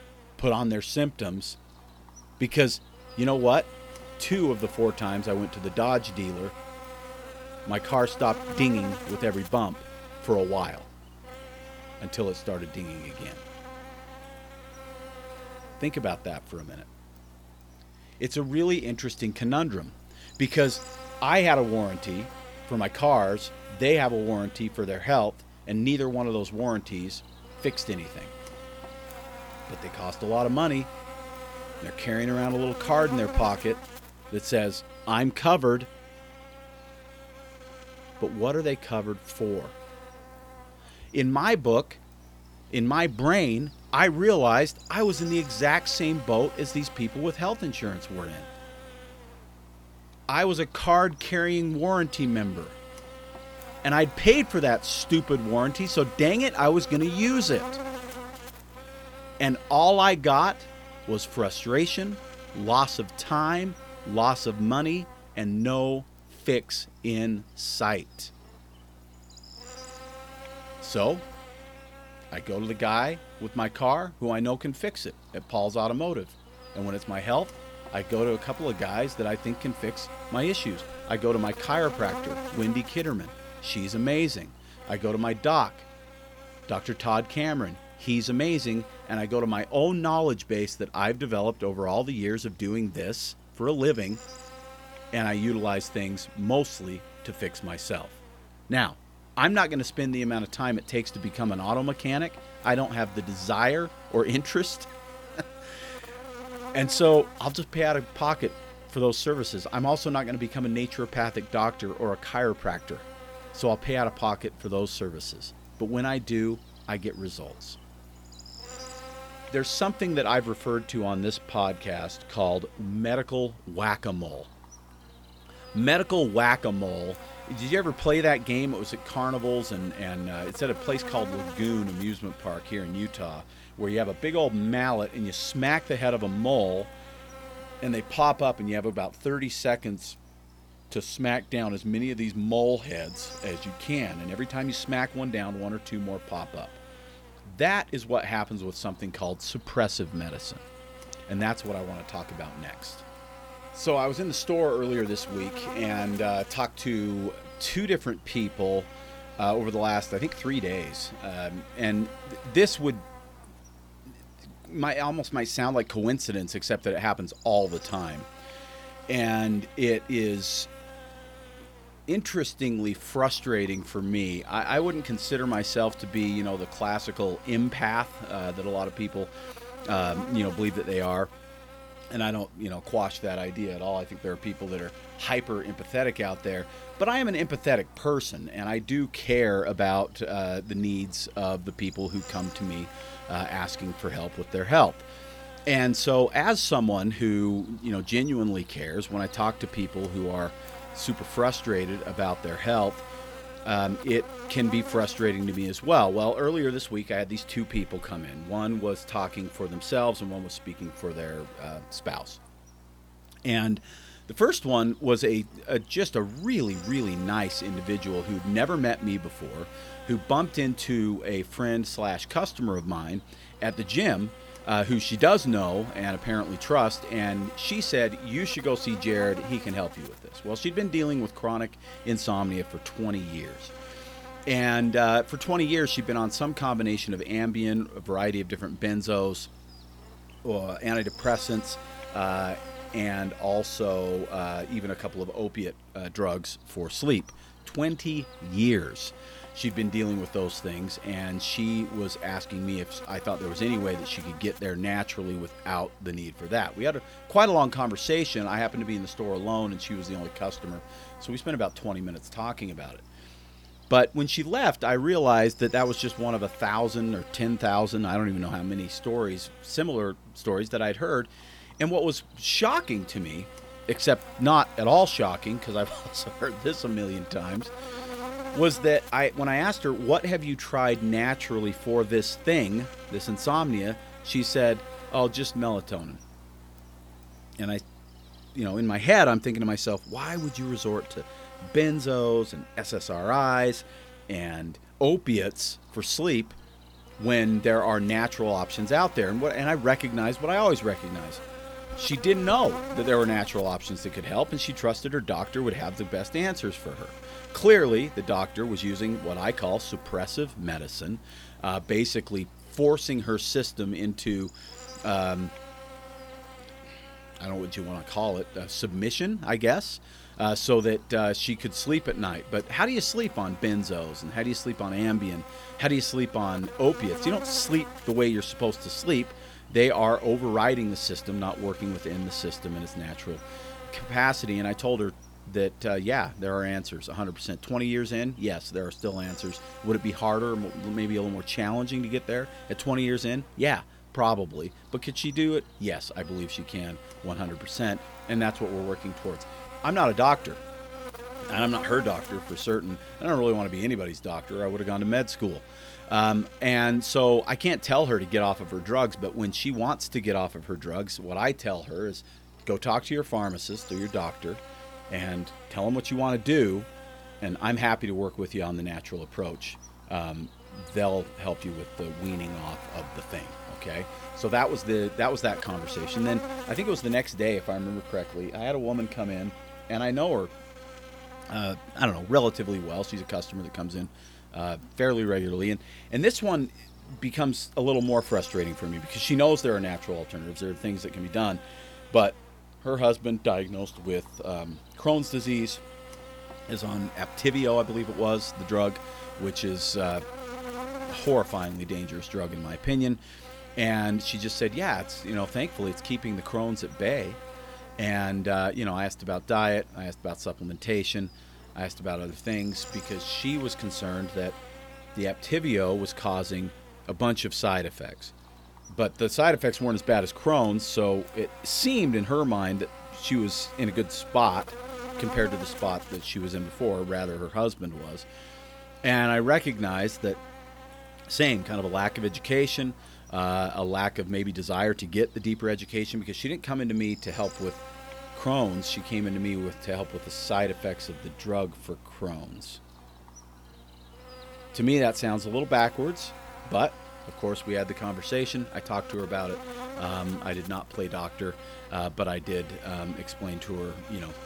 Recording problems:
electrical hum; noticeable; throughout; 60 Hz, 15 dB below the speech

